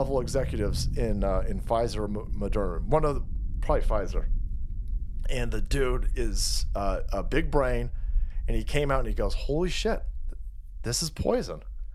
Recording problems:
low rumble; faint; throughout; 25 dB below the speech
abrupt cut into speech; at the start

